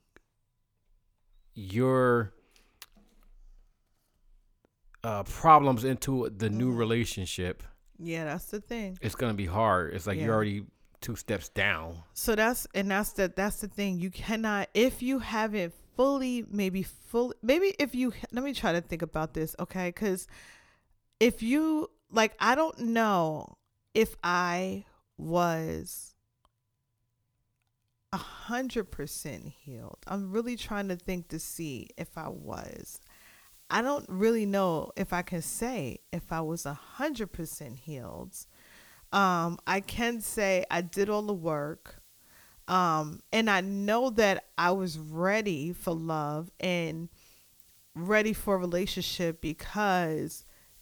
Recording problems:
hiss; faint; from 28 s on; 30 dB below the speech

